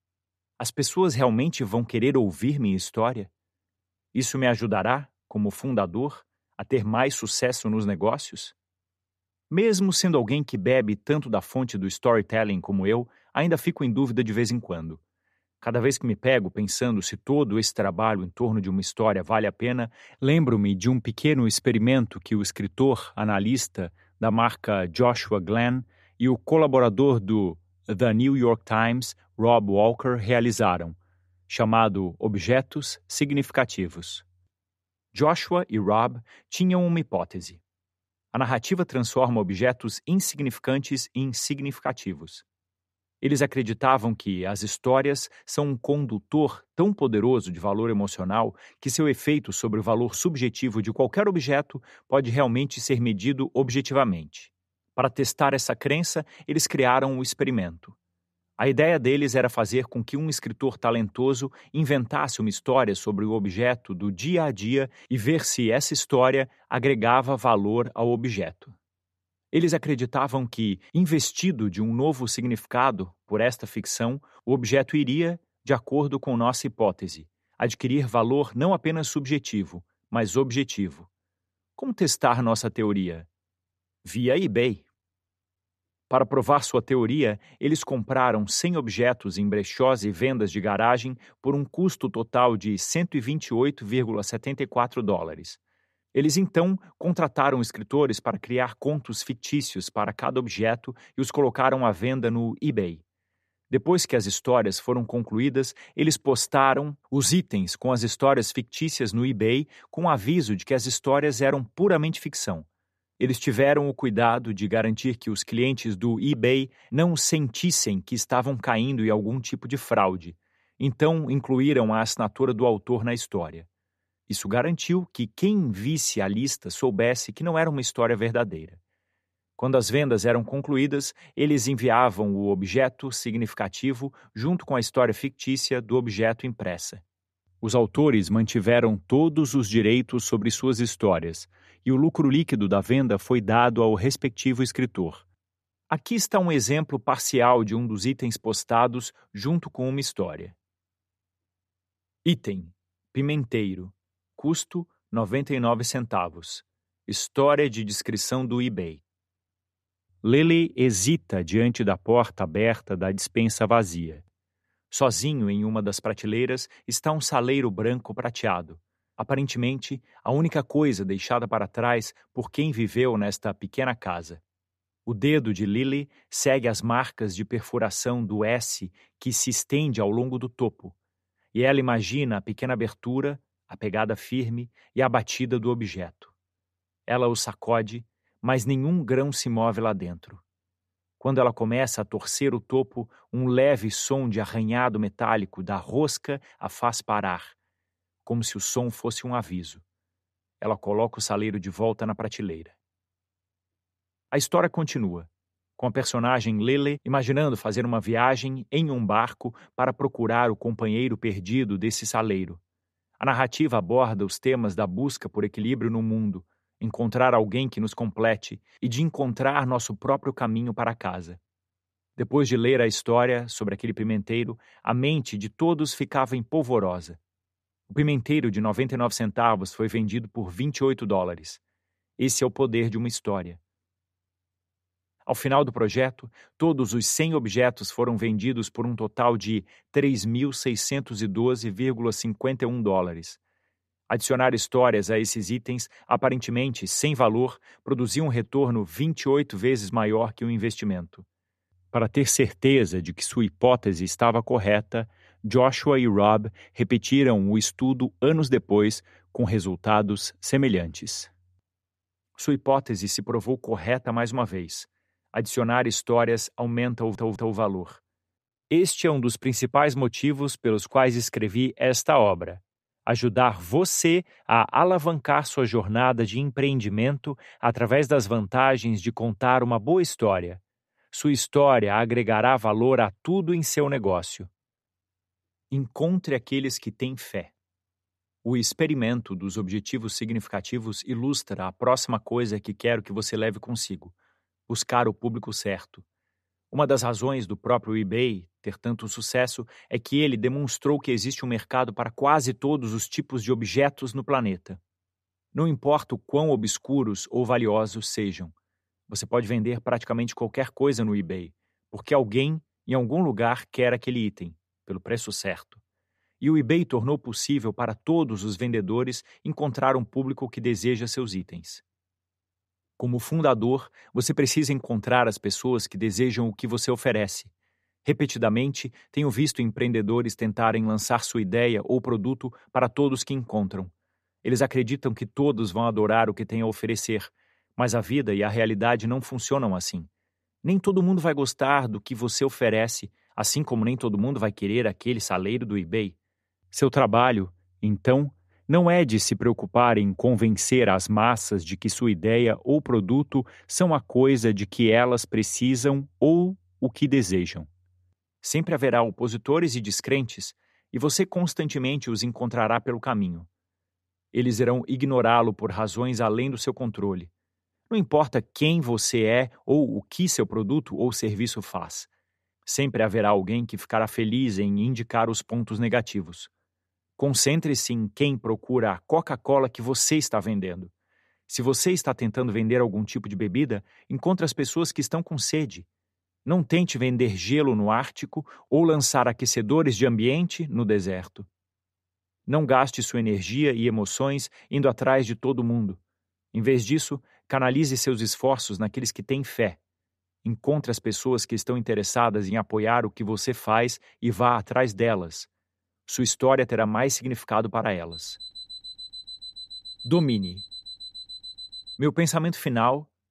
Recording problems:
audio stuttering; at 4:27
alarm; faint; from 6:48 to 6:52; peak 15 dB below the speech

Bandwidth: 14.5 kHz